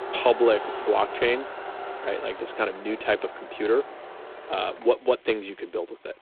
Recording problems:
phone-call audio; poor line
traffic noise; noticeable; throughout; 10 dB below the speech

